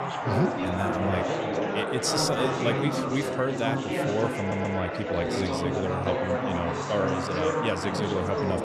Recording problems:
chatter from many people; very loud; throughout; 1 dB above the speech
wind noise on the microphone; heavy; 3 dB below the speech
audio stuttering; at 4.5 s

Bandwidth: 14.5 kHz